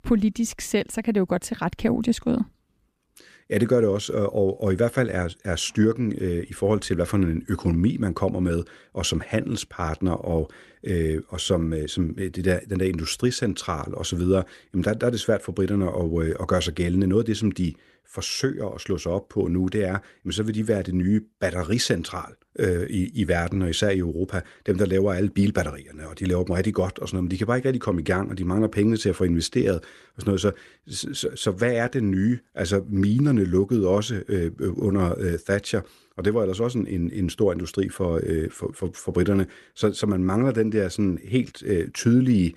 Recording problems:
none

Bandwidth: 15 kHz